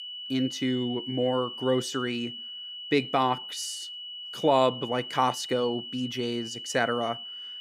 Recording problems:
high-pitched whine; loud; throughout; 3 kHz, 9 dB below the speech

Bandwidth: 15.5 kHz